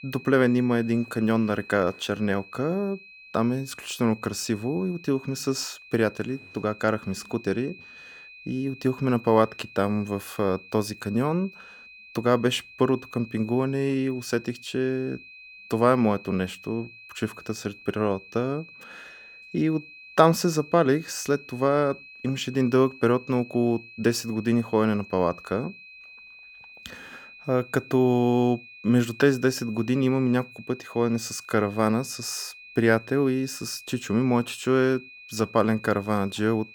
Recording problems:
high-pitched whine; noticeable; throughout; 2.5 kHz, 20 dB below the speech

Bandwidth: 18.5 kHz